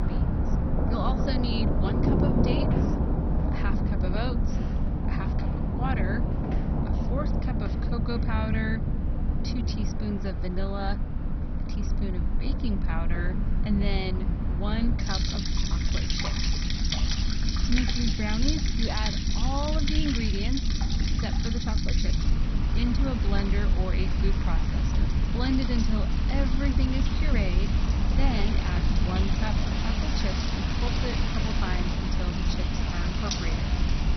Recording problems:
garbled, watery; badly; nothing above 6 kHz
rain or running water; very loud; throughout; as loud as the speech
low rumble; loud; throughout; 6 dB below the speech
wind noise on the microphone; occasional gusts; 15 dB below the speech

